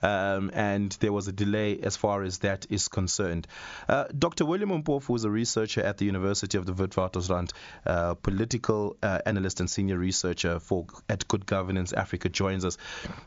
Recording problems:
high frequencies cut off; noticeable; nothing above 7.5 kHz
squashed, flat; somewhat

